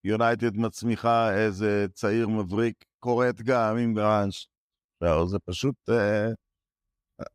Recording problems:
none

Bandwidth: 15.5 kHz